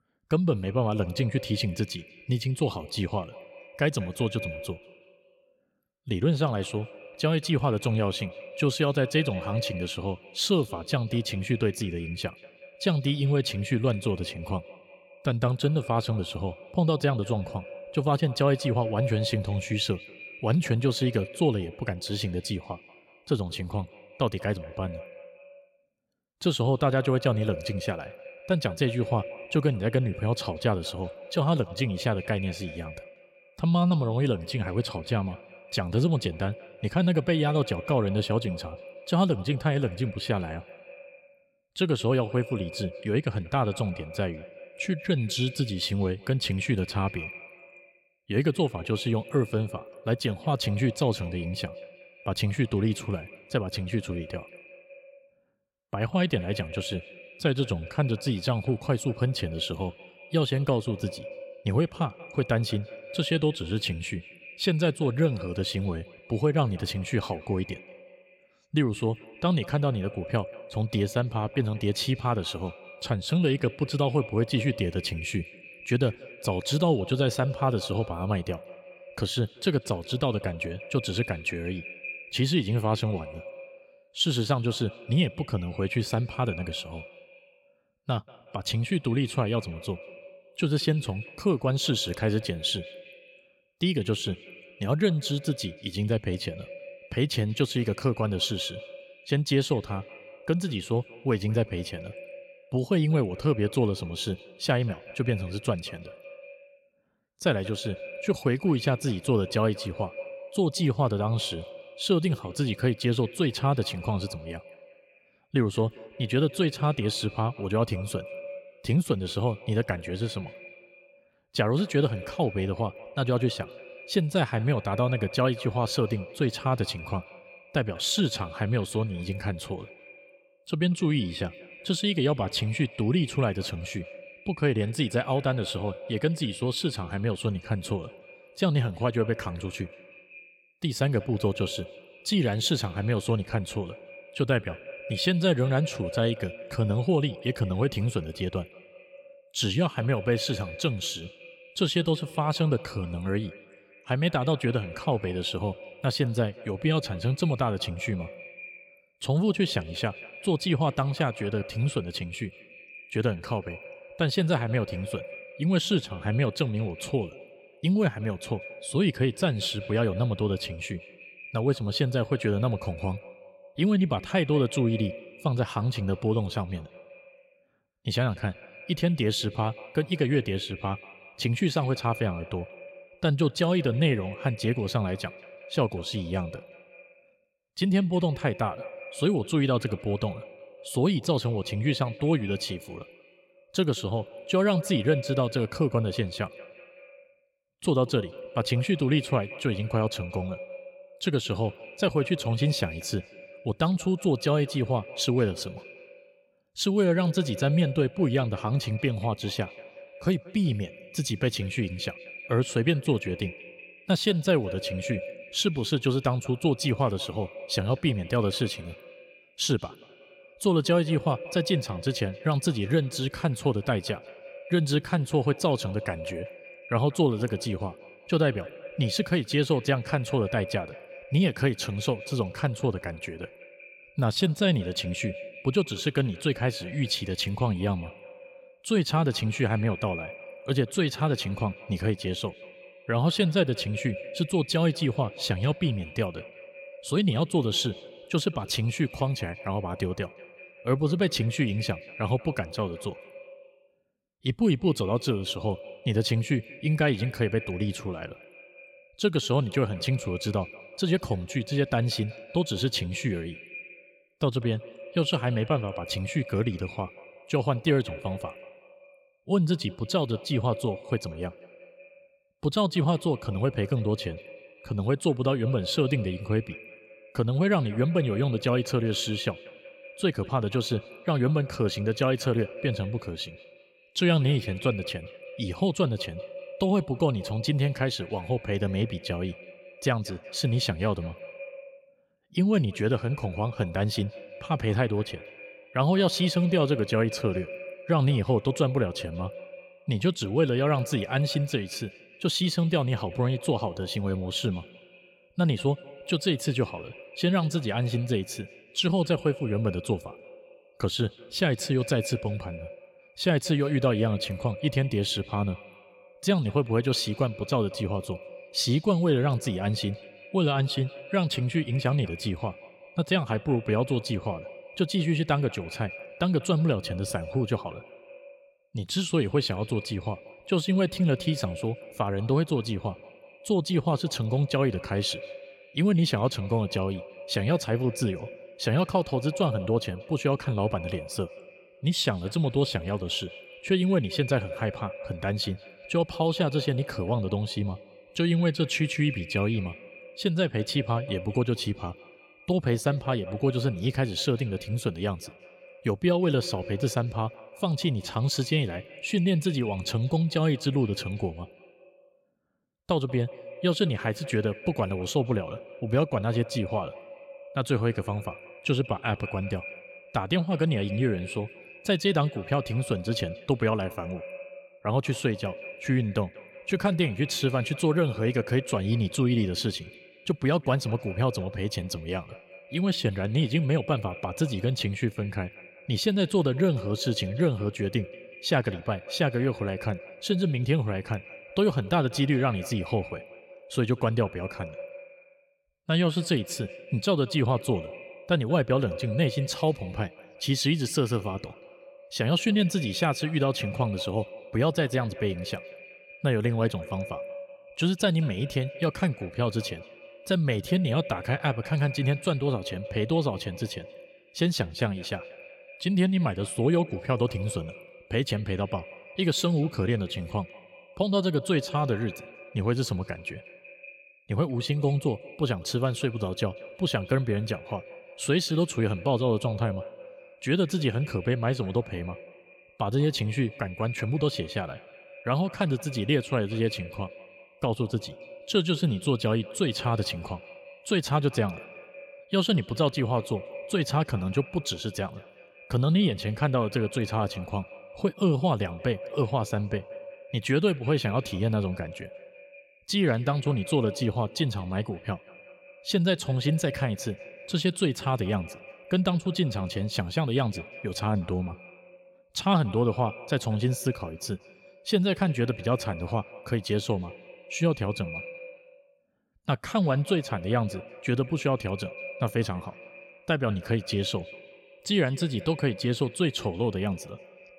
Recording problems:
echo of what is said; noticeable; throughout; 190 ms later, 15 dB below the speech

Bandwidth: 16.5 kHz